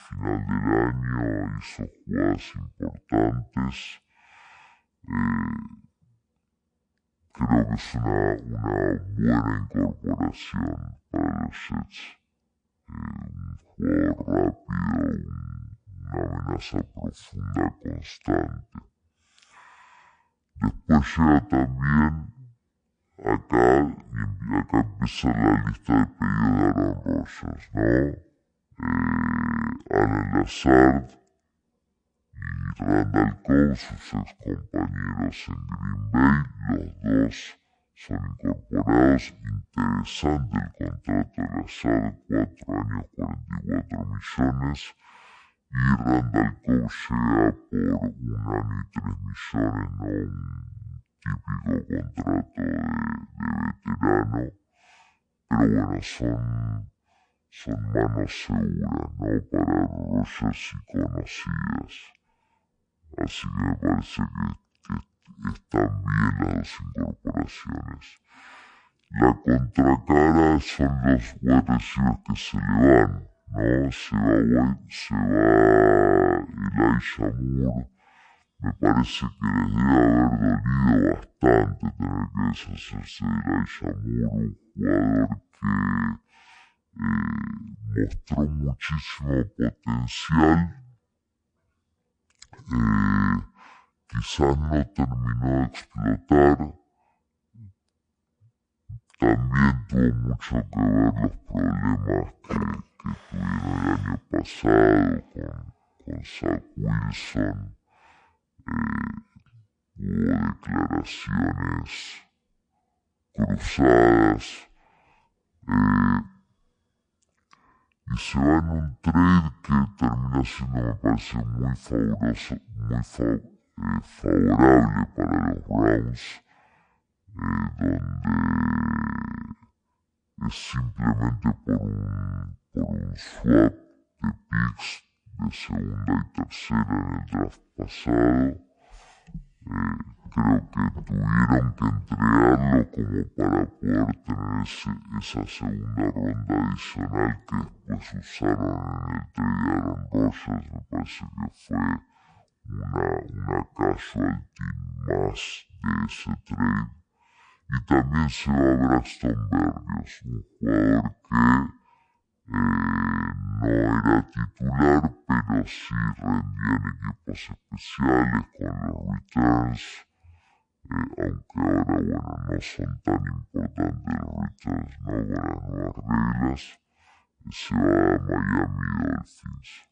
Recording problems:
wrong speed and pitch; too slow and too low; 0.5 times normal speed

